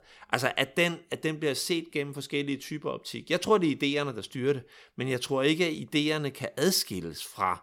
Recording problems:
none

